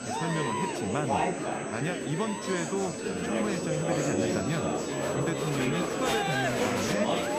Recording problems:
chatter from many people; very loud; throughout; 3 dB above the speech
high-pitched whine; loud; throughout; 8 kHz, 9 dB below the speech

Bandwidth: 15 kHz